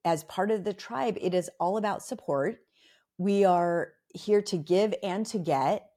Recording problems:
none

